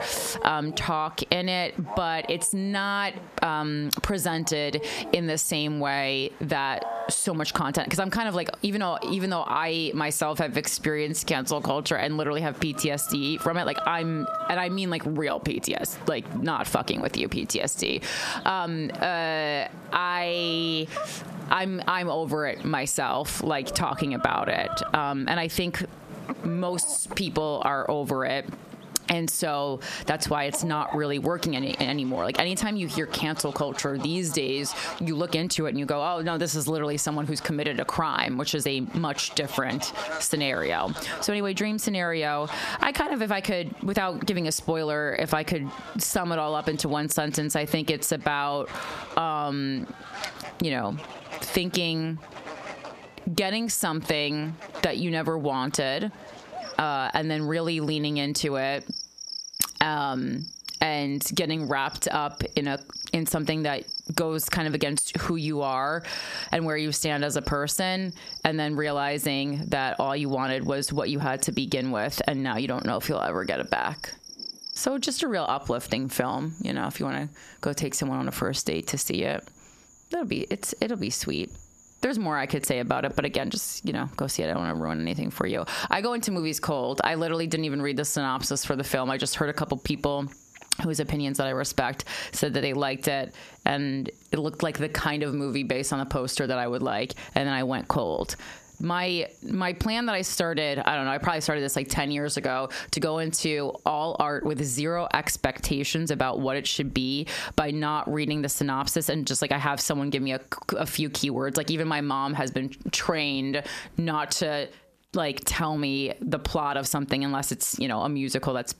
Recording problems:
squashed, flat; heavily, background pumping
animal sounds; noticeable; throughout; 15 dB below the speech

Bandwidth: 14.5 kHz